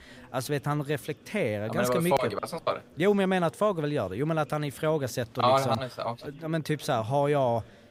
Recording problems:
chatter from many people; faint; throughout; 25 dB below the speech

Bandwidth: 15.5 kHz